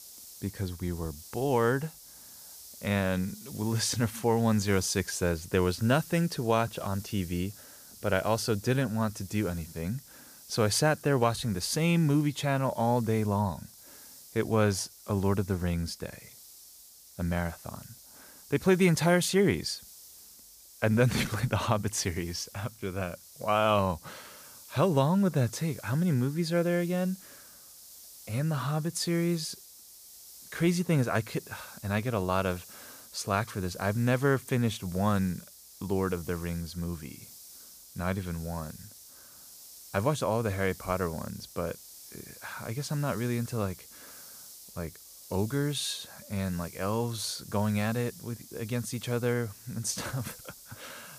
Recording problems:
hiss; noticeable; throughout; 20 dB below the speech

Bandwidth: 15 kHz